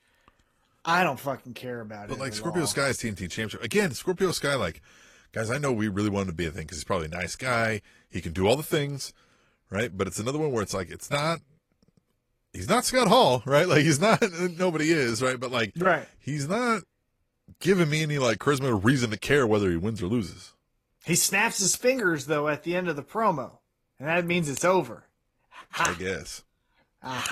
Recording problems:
garbled, watery; slightly; nothing above 13 kHz
abrupt cut into speech; at the end

